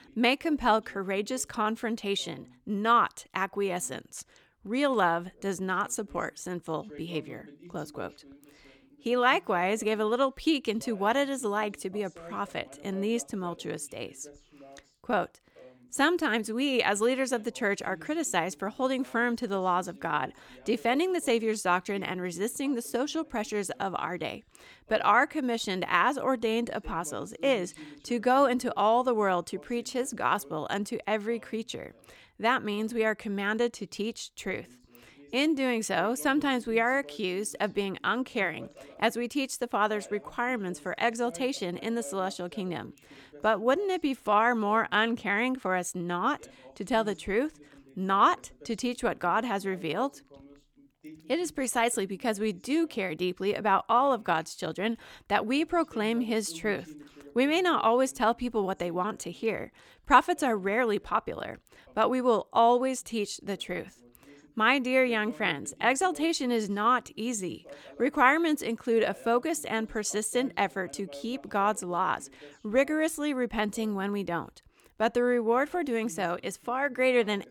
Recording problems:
voice in the background; faint; throughout; 25 dB below the speech

